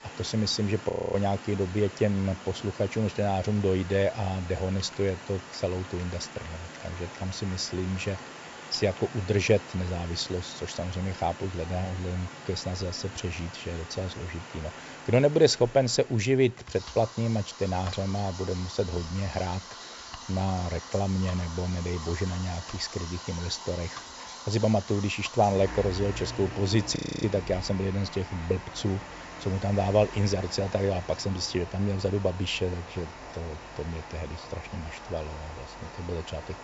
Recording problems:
high frequencies cut off; noticeable; nothing above 8 kHz
rain or running water; noticeable; throughout; 15 dB below the speech
household noises; faint; throughout; 25 dB below the speech
audio freezing; at 1 s and at 27 s

